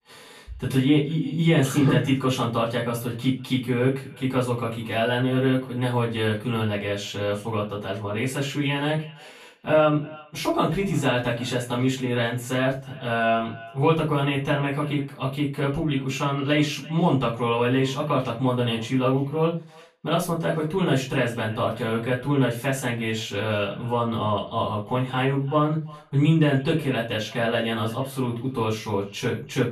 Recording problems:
off-mic speech; far
echo of what is said; faint; throughout; 340 ms later, 25 dB below the speech
room echo; slight; dies away in 0.3 s

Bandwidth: 14 kHz